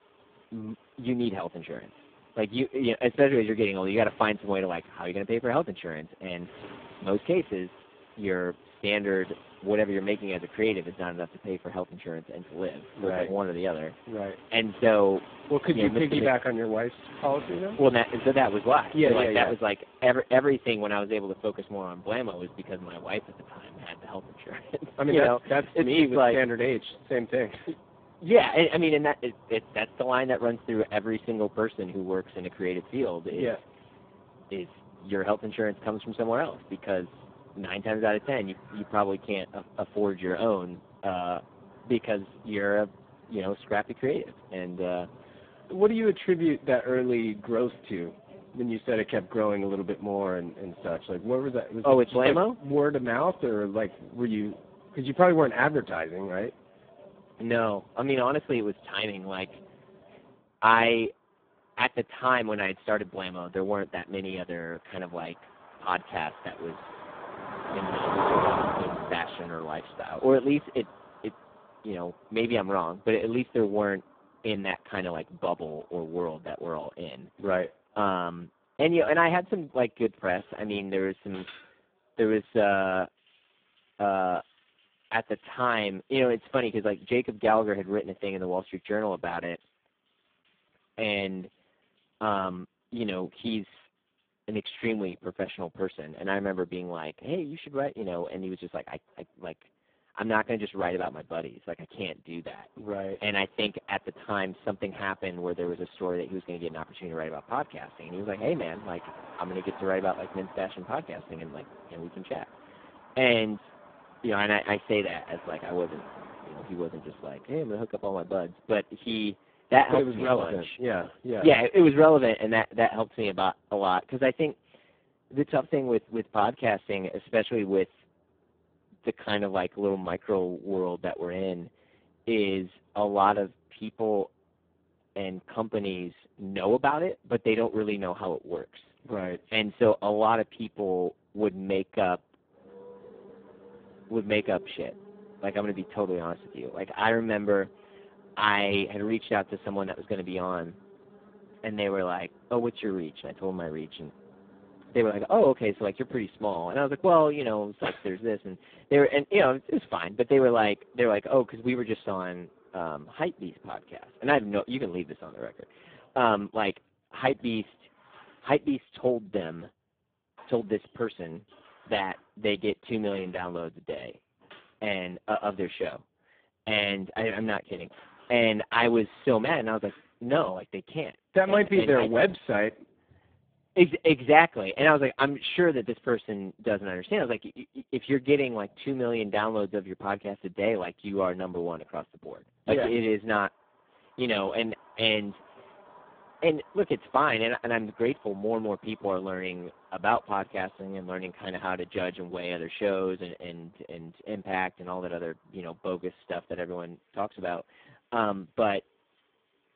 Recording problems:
phone-call audio; poor line
traffic noise; noticeable; throughout; 15 dB below the speech

